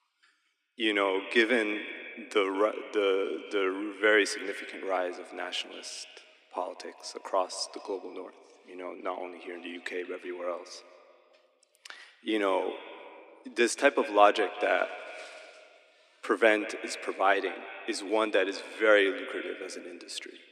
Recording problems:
echo of what is said; noticeable; throughout; 180 ms later, 15 dB below the speech
thin; somewhat; fading below 250 Hz

